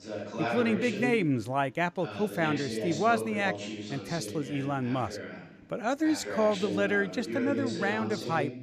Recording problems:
voice in the background; loud; throughout; 6 dB below the speech

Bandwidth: 14.5 kHz